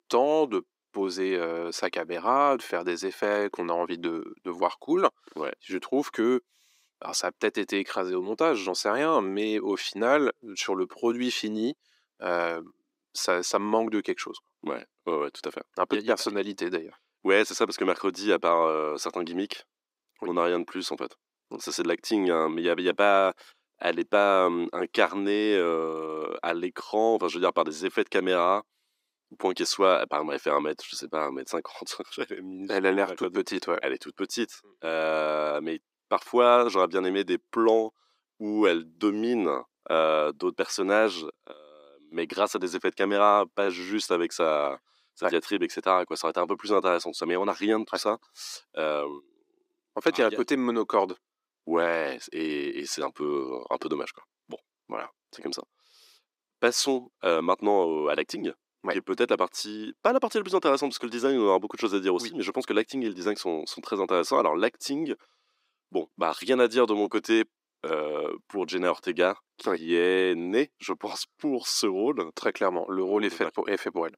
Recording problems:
thin; somewhat; fading below 300 Hz

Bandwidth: 15.5 kHz